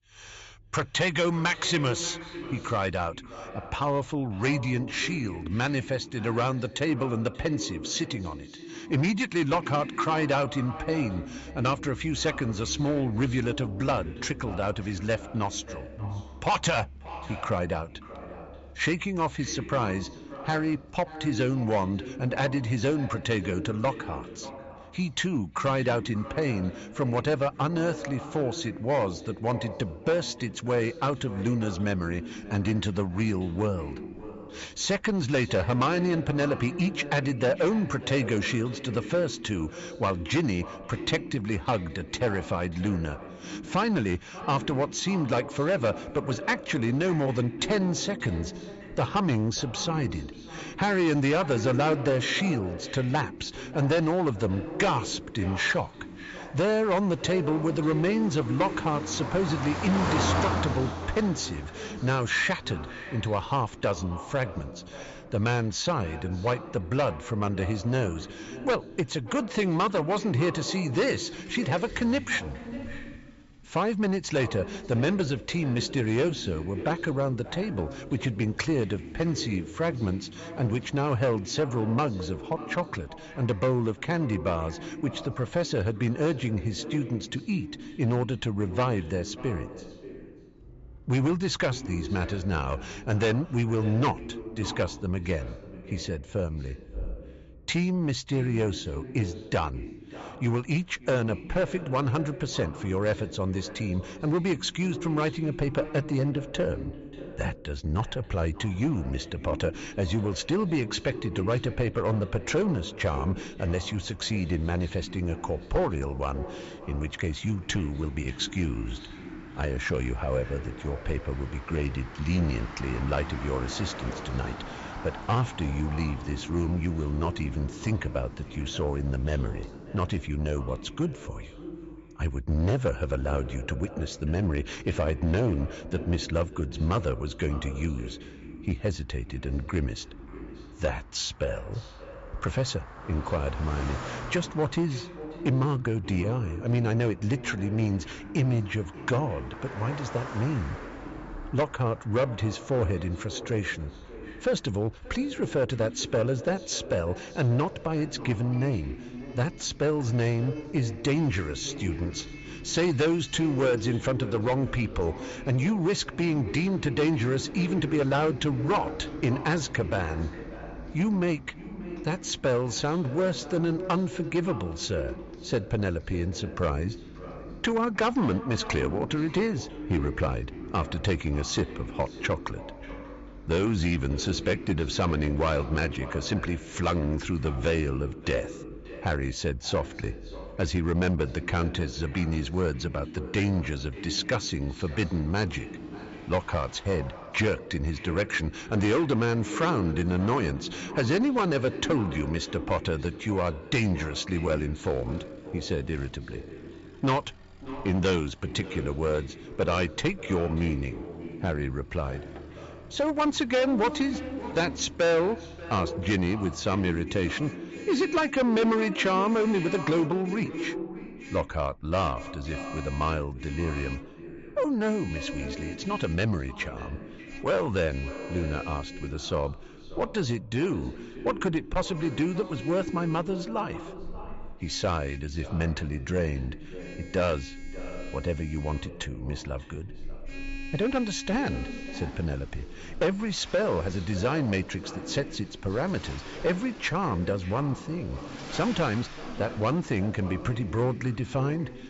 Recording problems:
echo of what is said; noticeable; throughout; 580 ms later, 10 dB below the speech
high frequencies cut off; noticeable; nothing above 8 kHz
distortion; slight; 6% of the sound clipped
traffic noise; noticeable; throughout; 15 dB below the speech

